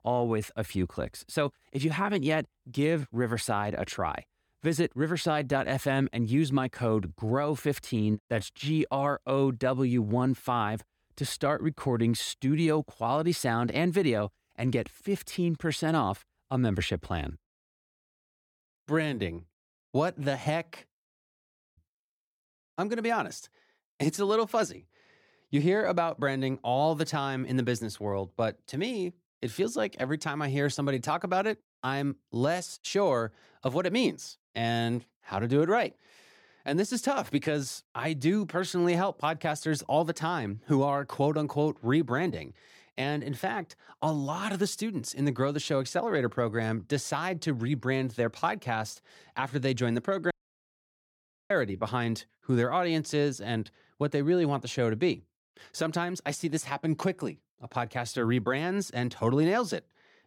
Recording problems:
audio cutting out; at 21 s for 0.5 s and at 50 s for 1 s

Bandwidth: 18 kHz